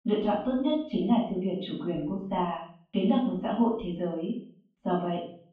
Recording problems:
off-mic speech; far
muffled; very; fading above 3 kHz
room echo; noticeable; dies away in 0.4 s

